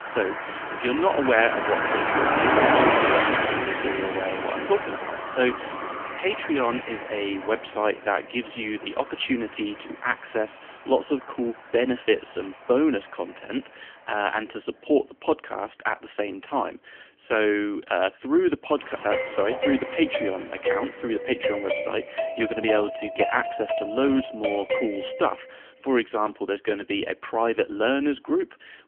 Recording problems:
phone-call audio; poor line; nothing above 3 kHz
traffic noise; very loud; throughout; 1 dB above the speech
alarm; noticeable; from 5 to 6 s; peak 9 dB below the speech
doorbell; noticeable; from 19 to 25 s; peak level with the speech

